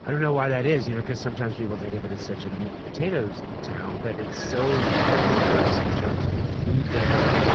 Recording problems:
garbled, watery; badly
rain or running water; very loud; throughout; 2 dB above the speech

